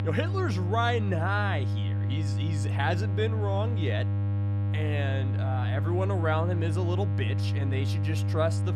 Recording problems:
electrical hum; loud; throughout; 50 Hz, 9 dB below the speech

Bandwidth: 14.5 kHz